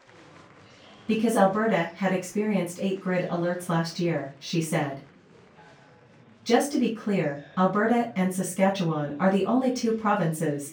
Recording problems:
off-mic speech; far
room echo; slight; dies away in 0.3 s
murmuring crowd; faint; throughout; 25 dB below the speech

